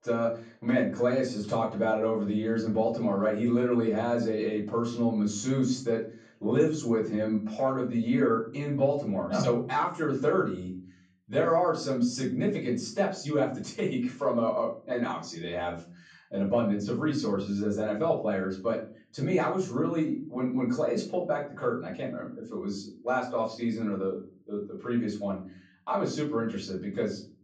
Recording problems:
off-mic speech; far
room echo; slight; dies away in 0.5 s

